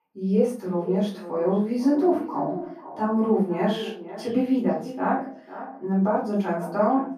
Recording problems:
off-mic speech; far
muffled; very; fading above 2.5 kHz
echo of what is said; noticeable; throughout; 500 ms later, 15 dB below the speech
room echo; slight; dies away in 0.3 s

